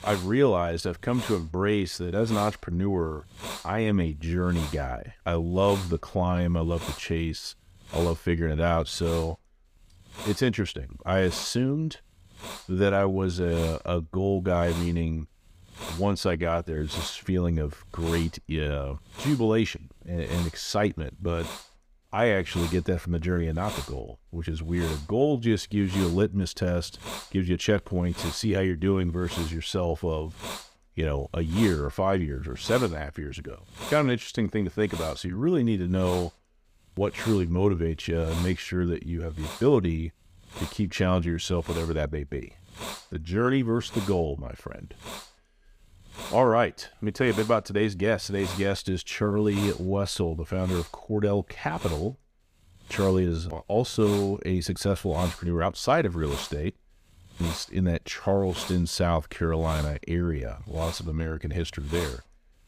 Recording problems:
hiss; noticeable; throughout; 15 dB below the speech

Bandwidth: 15 kHz